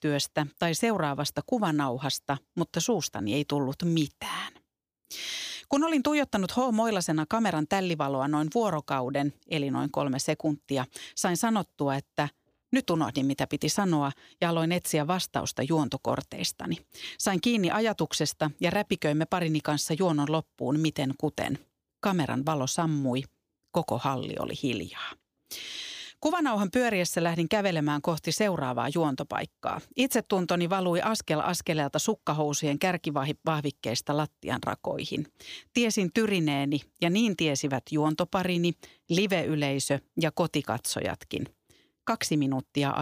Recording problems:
abrupt cut into speech; at the end

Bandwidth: 15 kHz